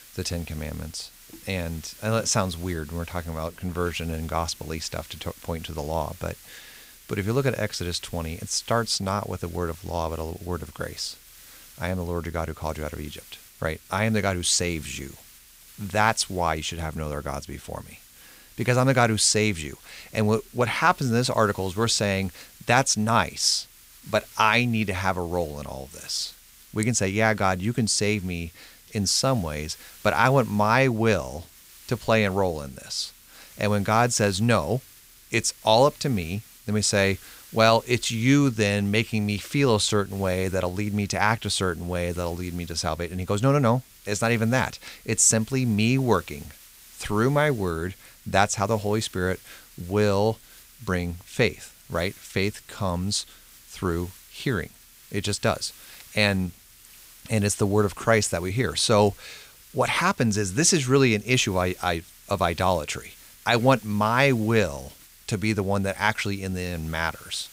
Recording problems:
hiss; faint; throughout; 20 dB below the speech

